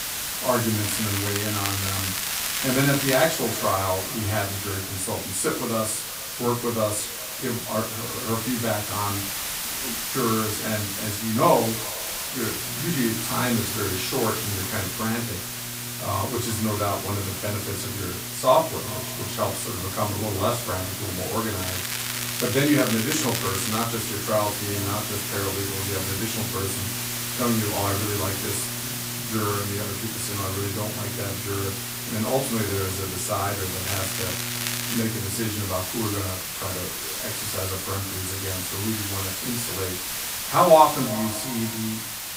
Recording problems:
off-mic speech; far
echo of what is said; faint; throughout; 350 ms later, 20 dB below the speech
room echo; slight; dies away in 0.3 s
hiss; loud; throughout; 2 dB below the speech
crackling; loud; from 1 to 3.5 s, from 22 to 24 s and from 34 to 35 s; 3 dB below the speech
electrical hum; noticeable; from 13 to 35 s; 60 Hz, 20 dB below the speech

